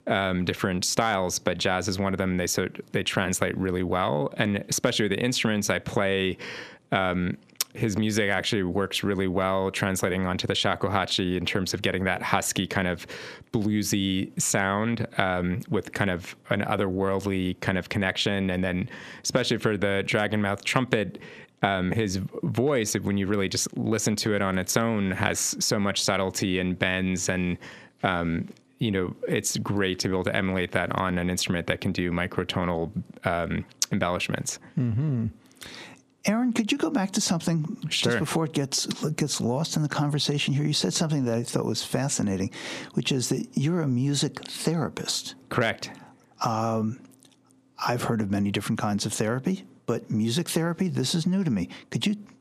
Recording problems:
squashed, flat; heavily

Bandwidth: 14.5 kHz